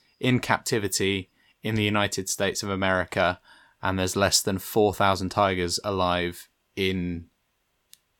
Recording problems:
none

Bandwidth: 17.5 kHz